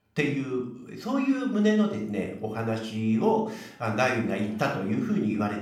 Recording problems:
room echo; noticeable; dies away in 0.5 s
off-mic speech; somewhat distant

